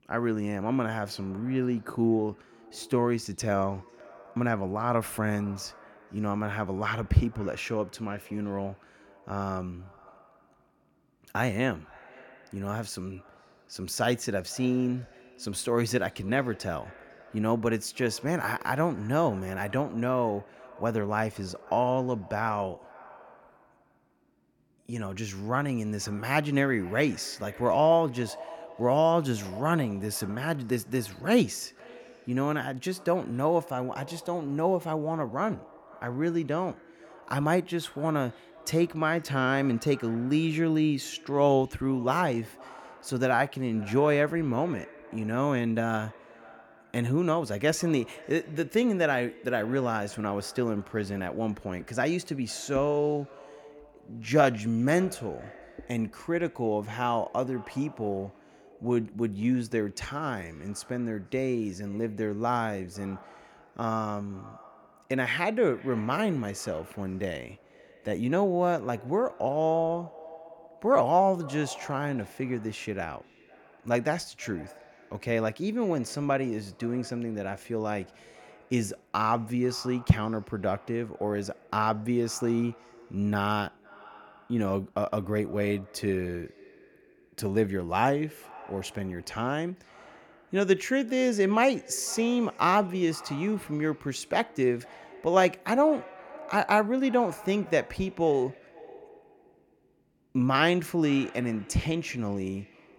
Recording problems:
echo of what is said; faint; throughout; 500 ms later, 20 dB below the speech

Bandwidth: 18 kHz